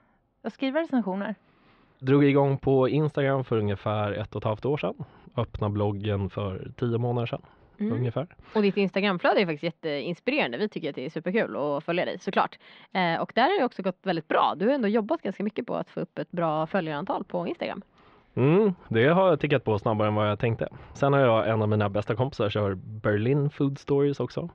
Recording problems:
muffled; slightly; fading above 3.5 kHz

